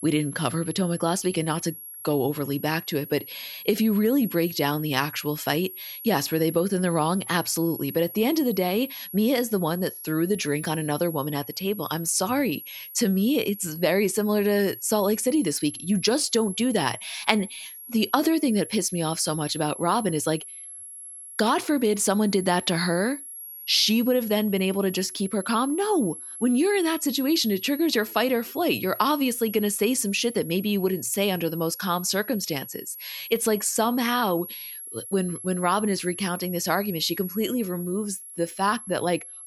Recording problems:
high-pitched whine; noticeable; throughout; 11.5 kHz, 10 dB below the speech

